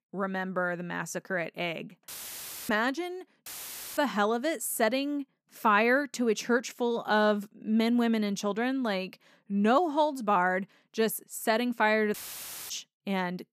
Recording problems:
audio cutting out; filled with static; at 2 s for 0.5 s, at 3.5 s for 0.5 s and at 12 s for 0.5 s

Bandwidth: 14.5 kHz